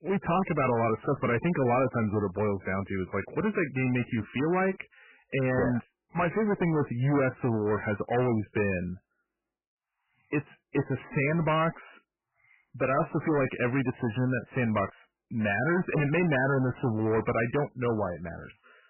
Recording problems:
distortion; heavy; 16% of the sound clipped
garbled, watery; badly; nothing above 3 kHz

